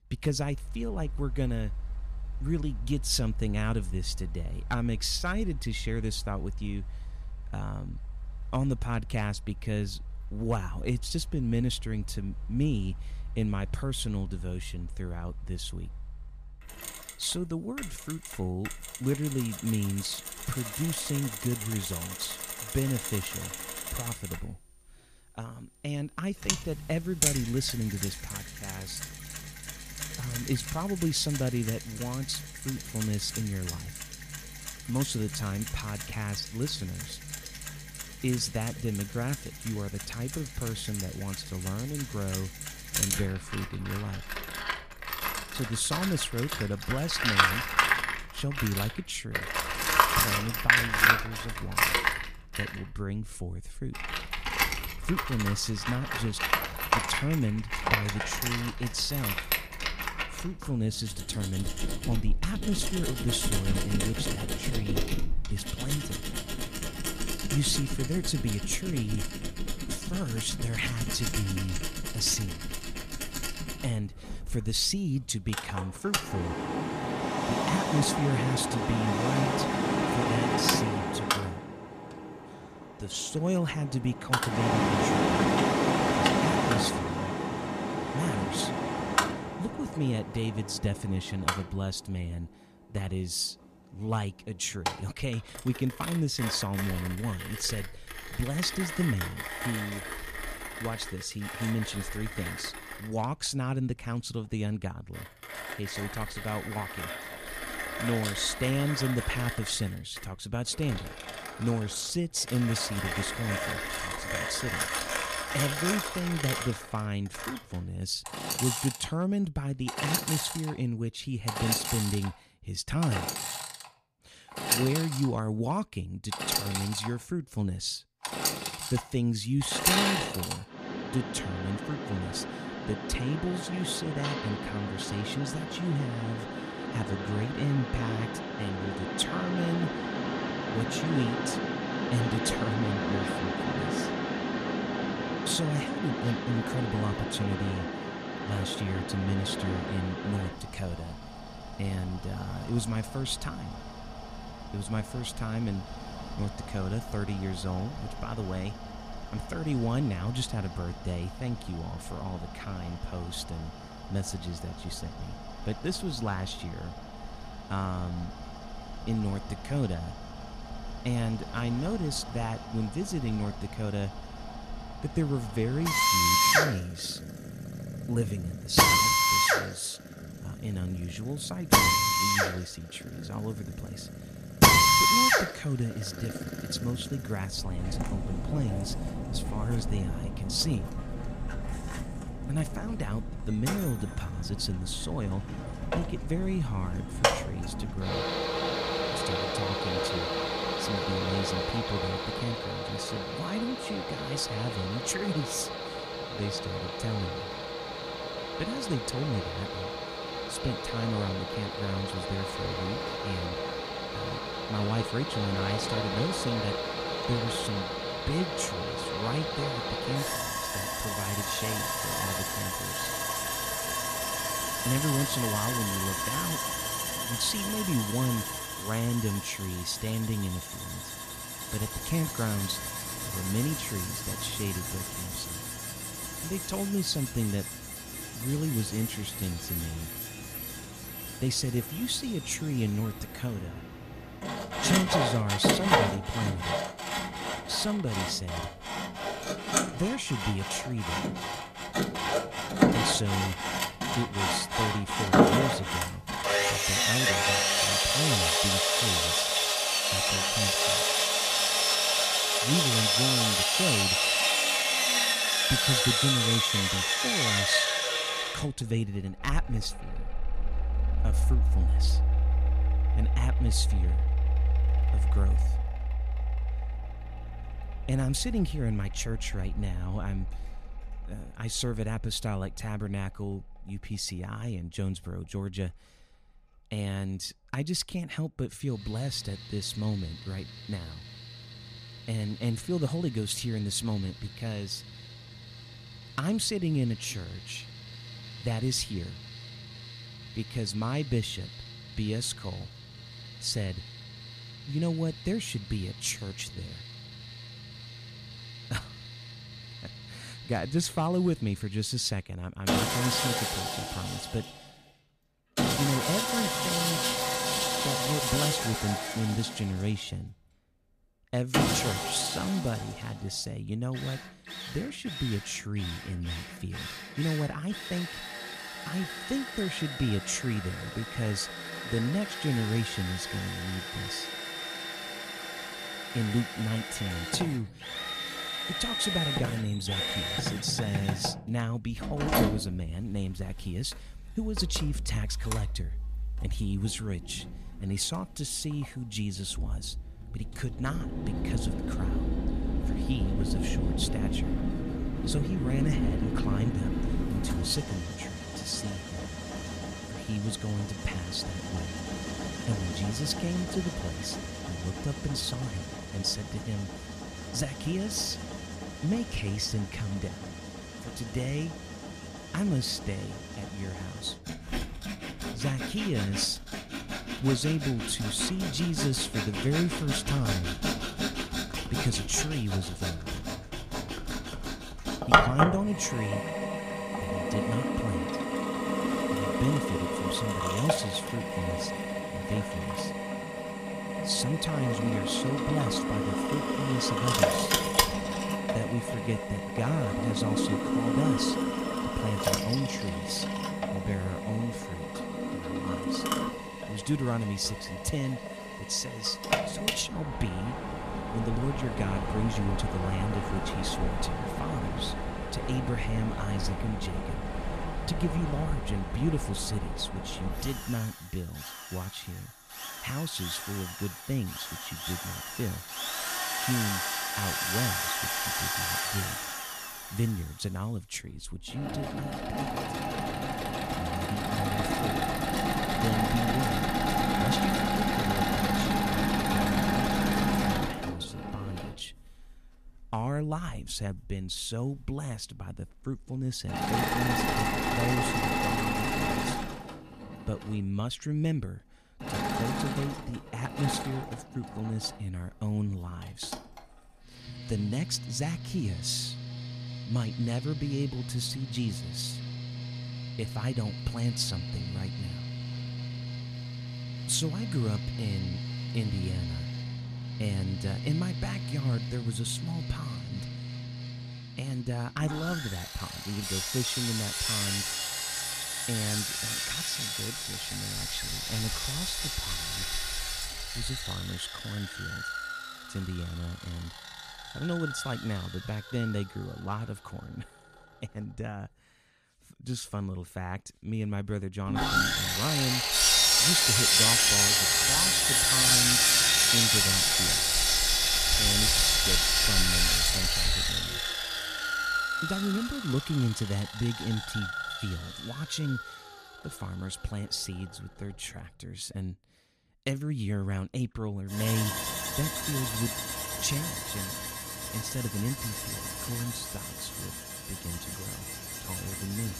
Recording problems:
machinery noise; very loud; throughout; 3 dB above the speech

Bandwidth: 14.5 kHz